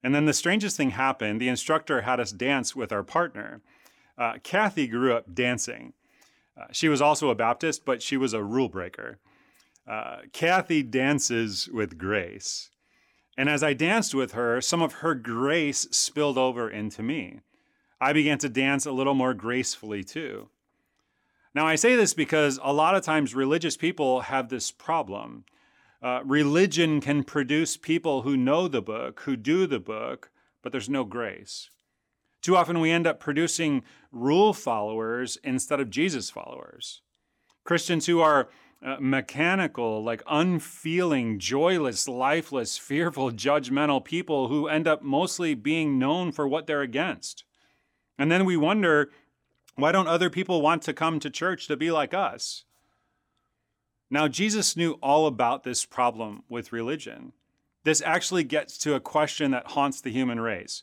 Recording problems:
none

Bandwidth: 17.5 kHz